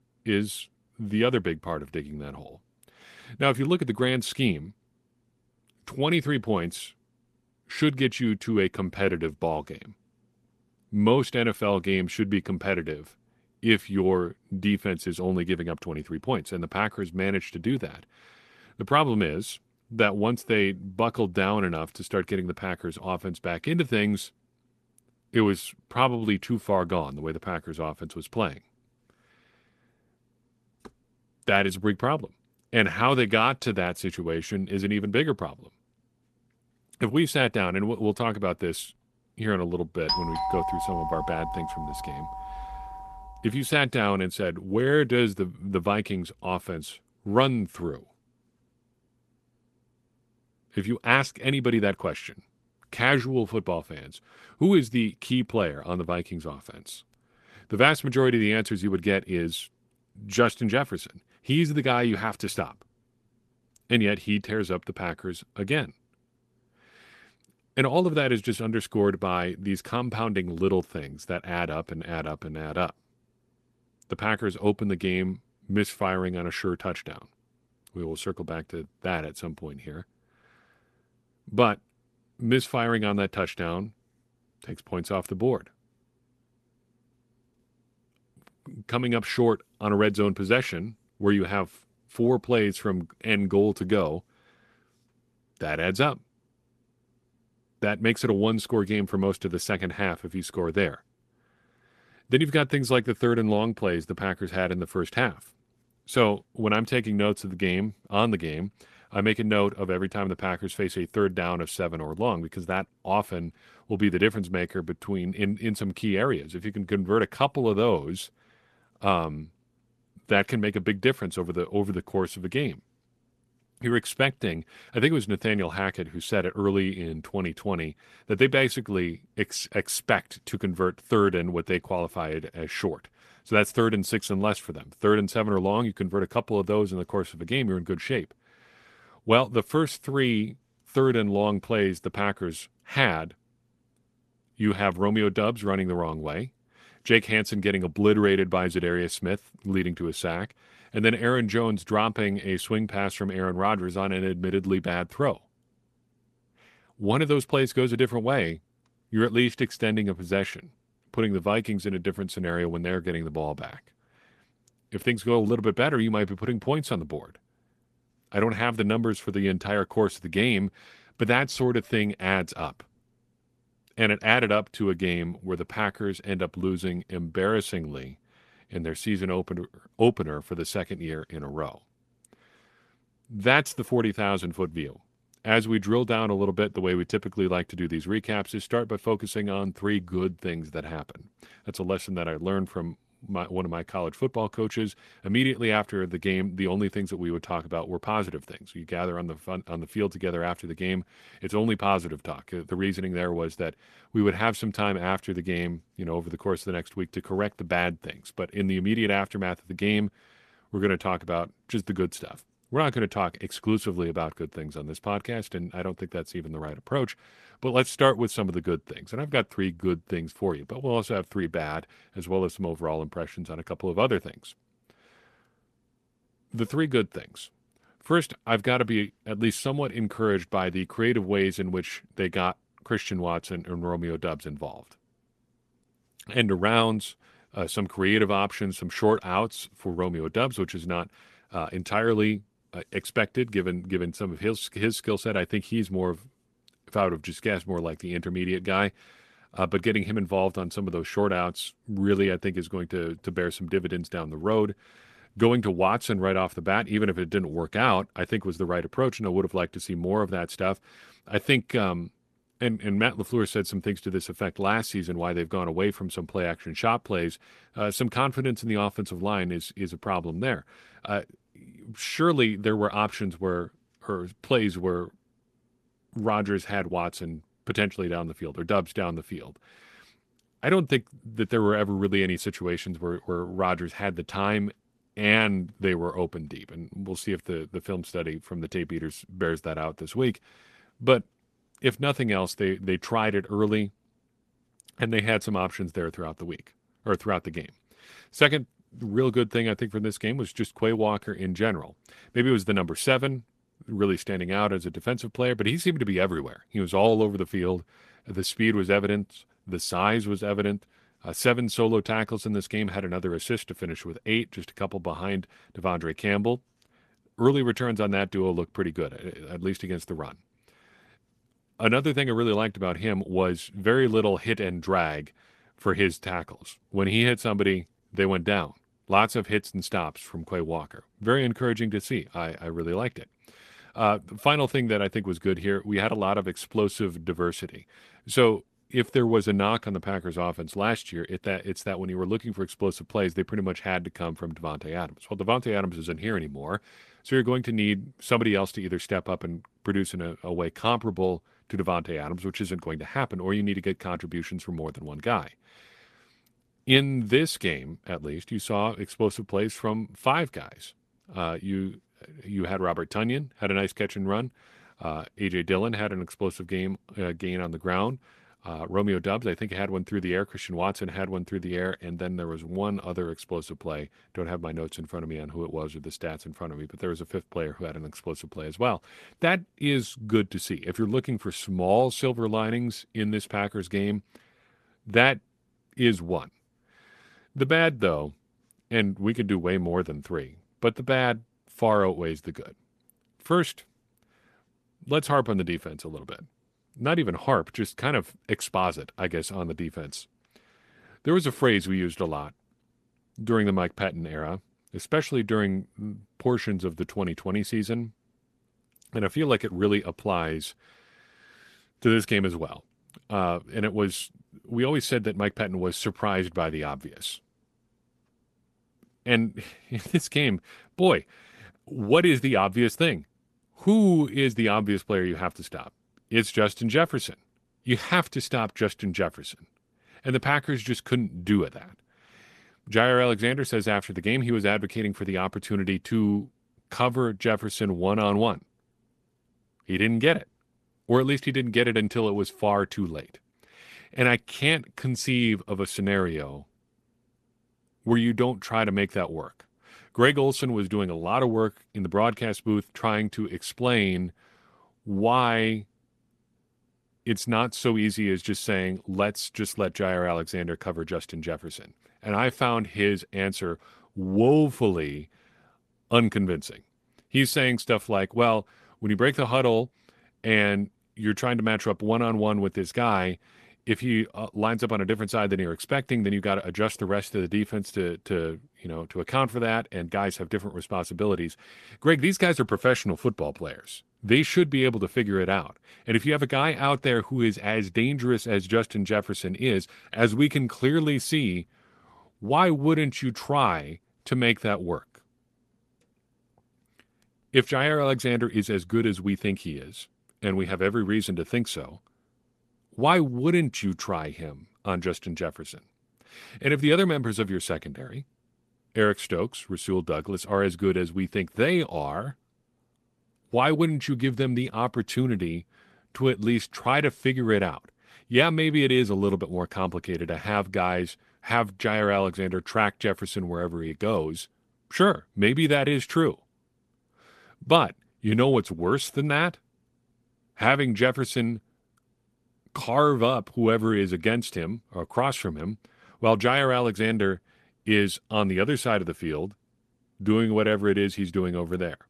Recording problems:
garbled, watery; slightly; nothing above 13.5 kHz
doorbell; noticeable; from 40 to 43 s; peak level with the speech

